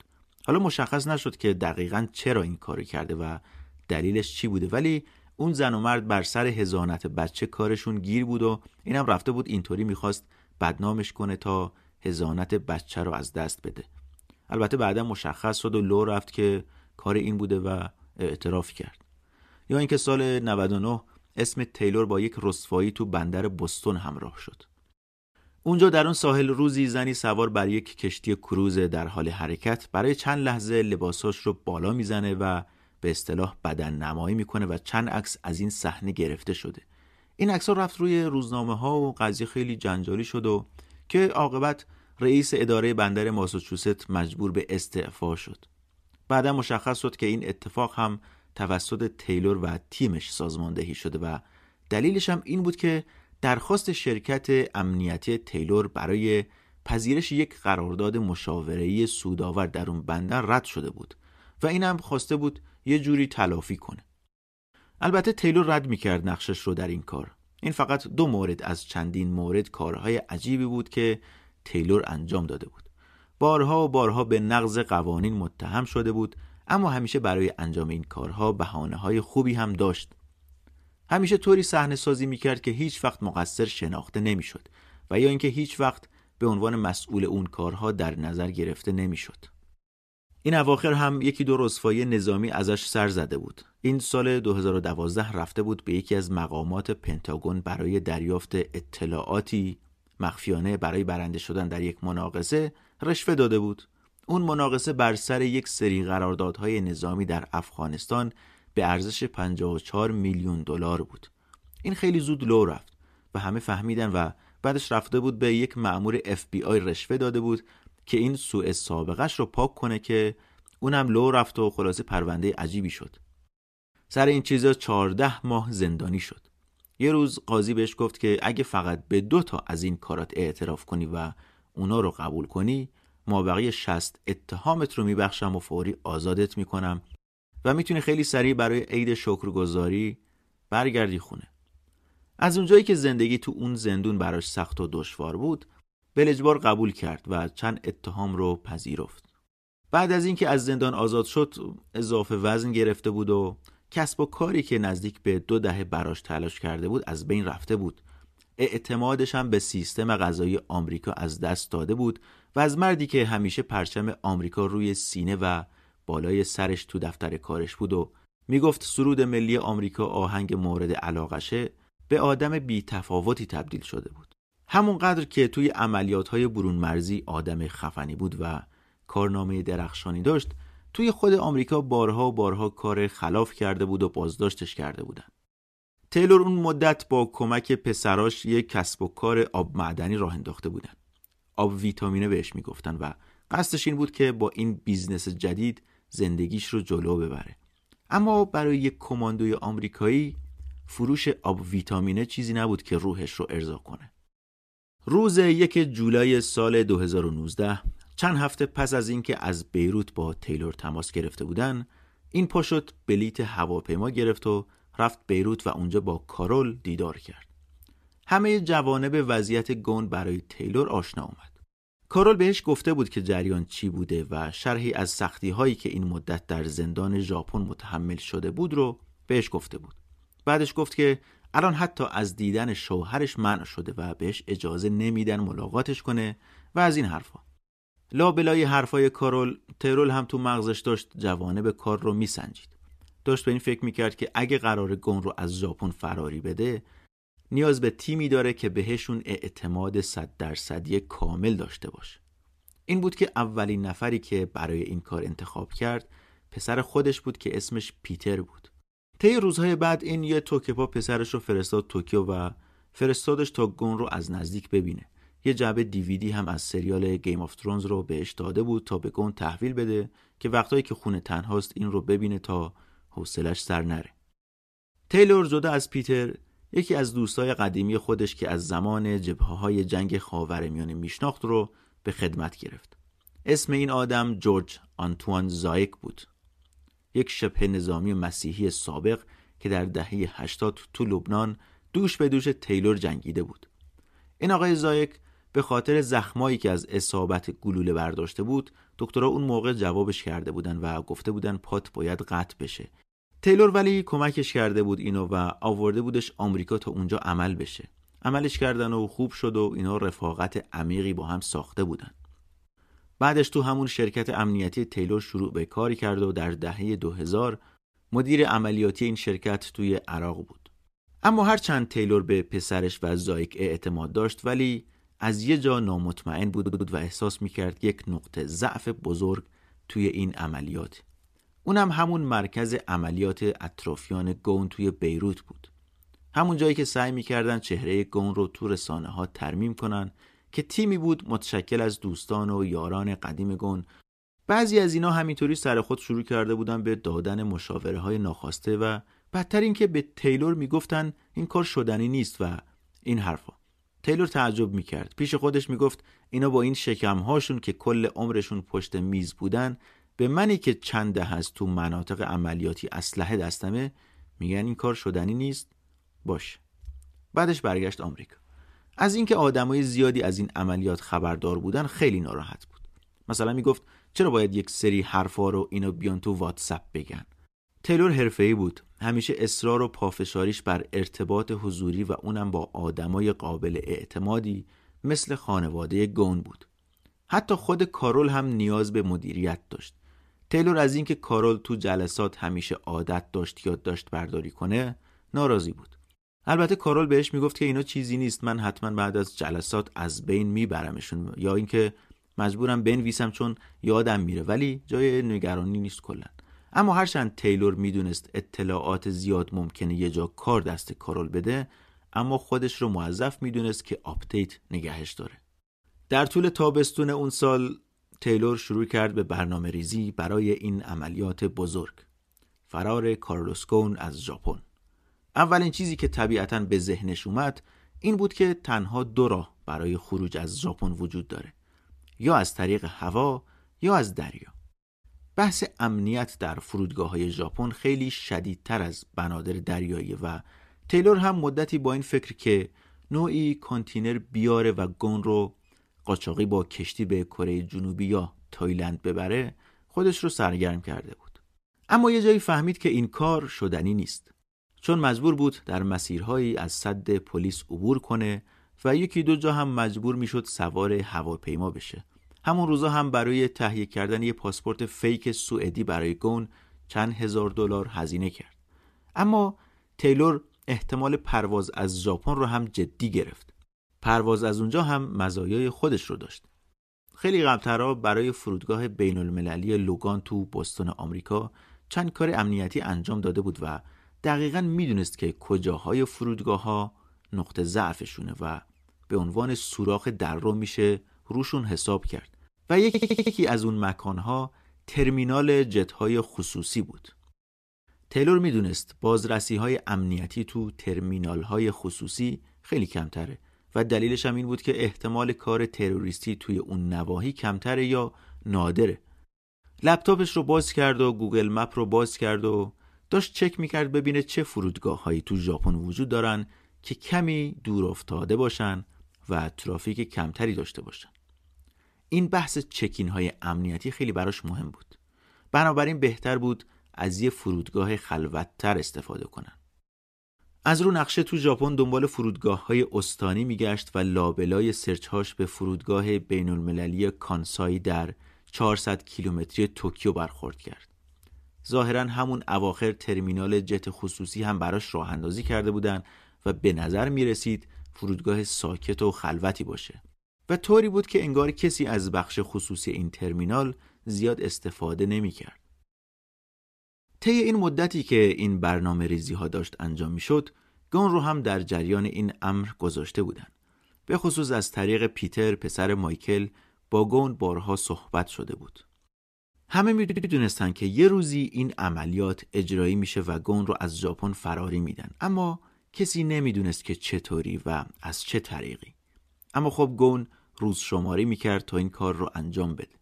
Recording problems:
audio stuttering; at 5:27, at 8:13 and at 9:30

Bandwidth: 14.5 kHz